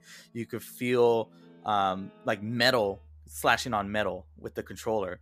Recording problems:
background music; faint; throughout; 30 dB below the speech

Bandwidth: 14.5 kHz